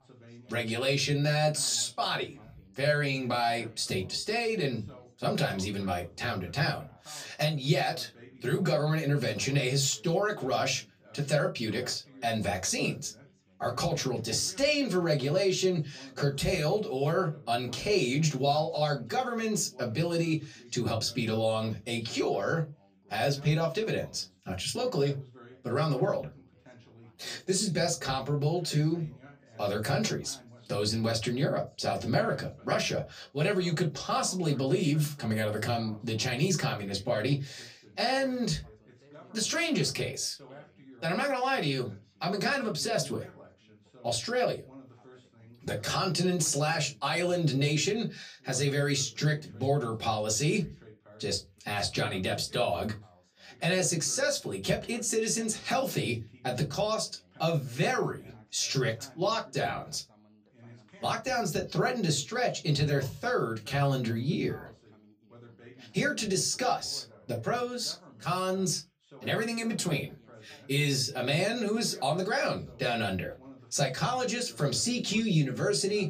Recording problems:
off-mic speech; far
room echo; very slight; dies away in 0.2 s
background chatter; faint; throughout; 2 voices, 25 dB below the speech

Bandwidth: 15 kHz